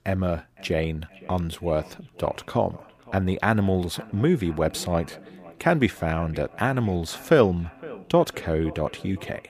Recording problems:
echo of what is said; faint; throughout; 510 ms later, 20 dB below the speech

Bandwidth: 15 kHz